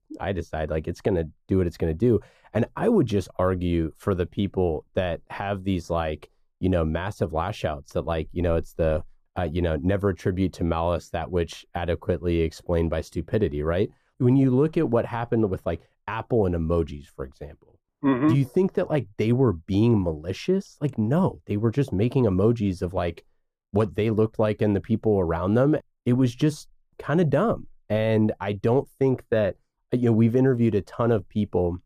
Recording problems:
muffled; slightly; fading above 1.5 kHz

